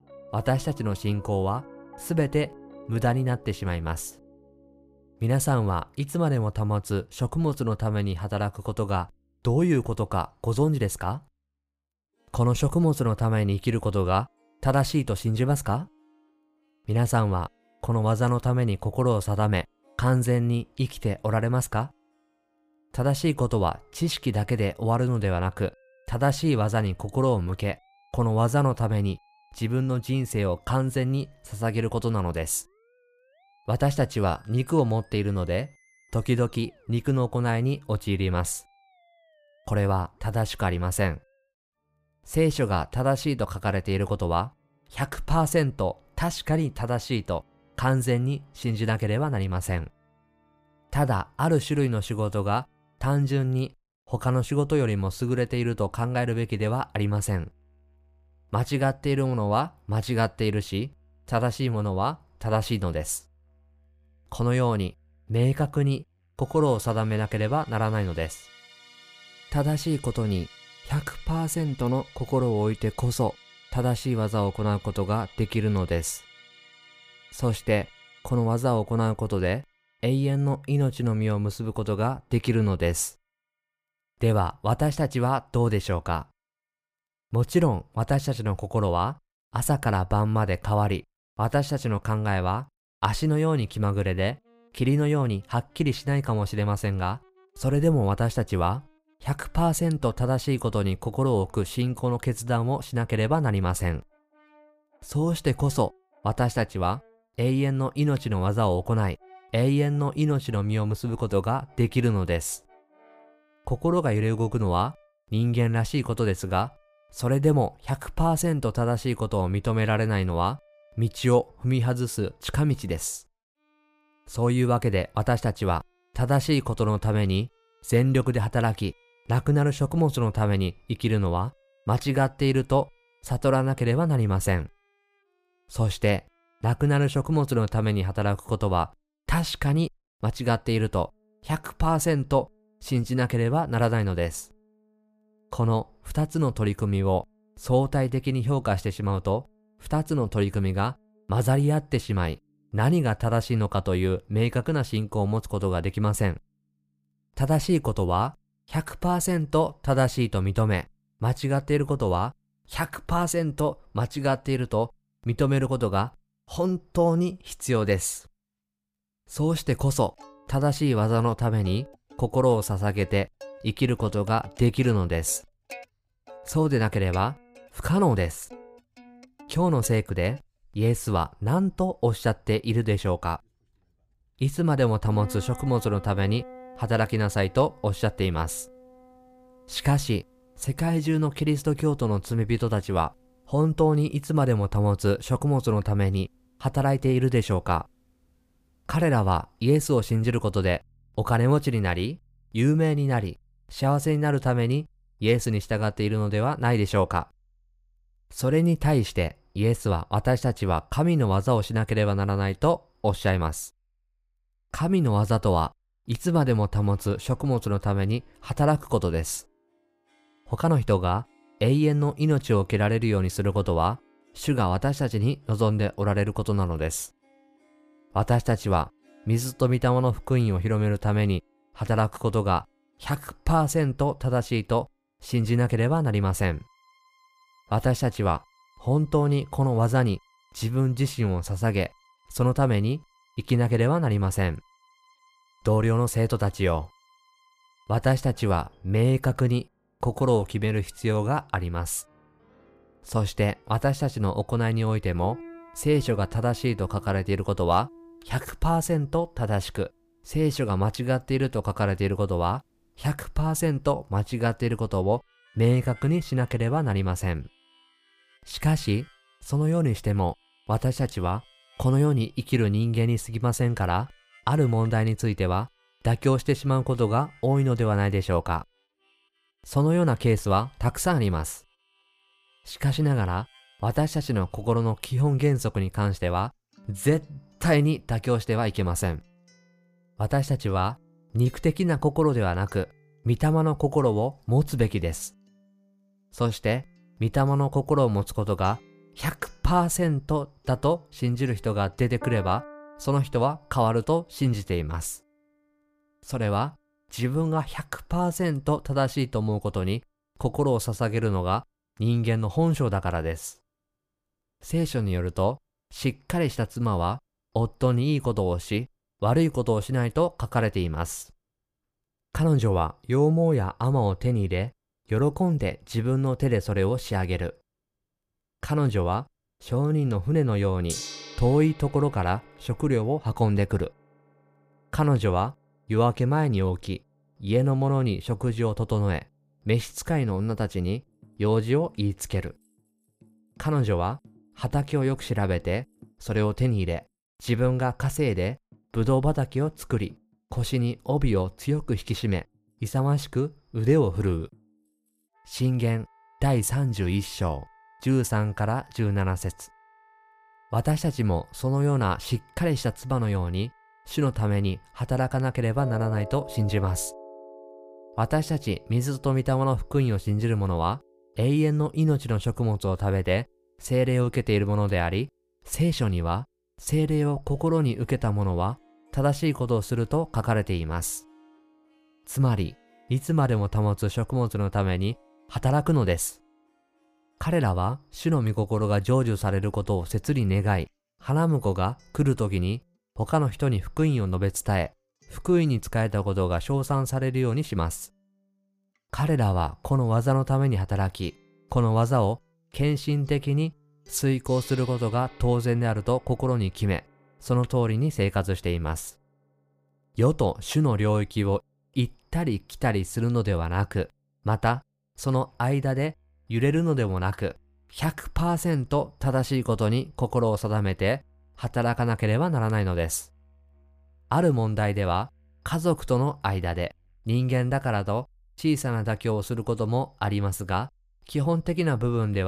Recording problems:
background music; faint; throughout; 25 dB below the speech
abrupt cut into speech; at the end

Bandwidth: 15 kHz